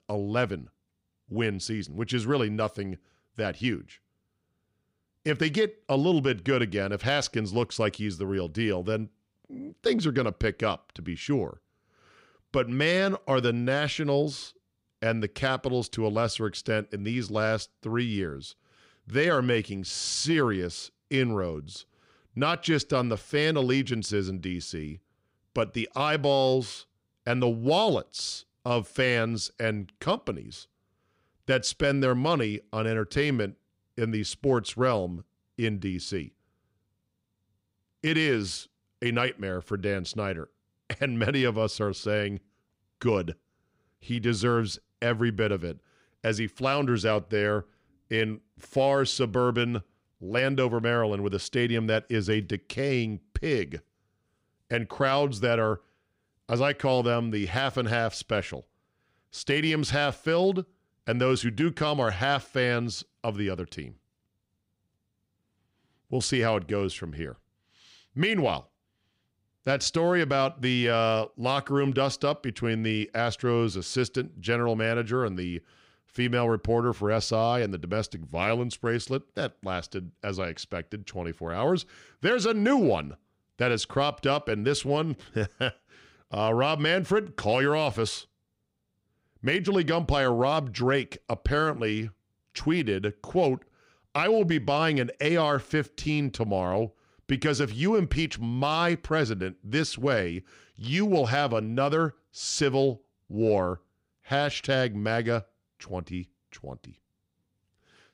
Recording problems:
none

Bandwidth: 15.5 kHz